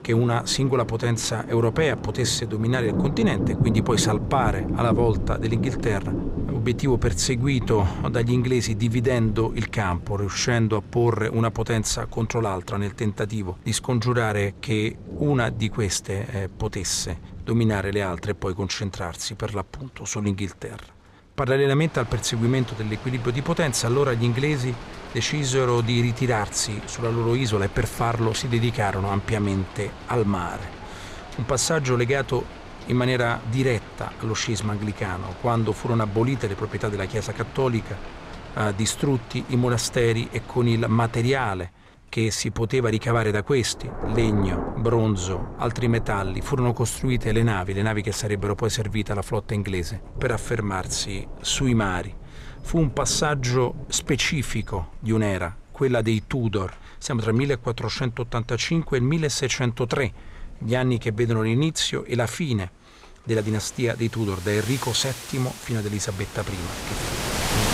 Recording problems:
rain or running water; noticeable; throughout; 10 dB below the speech

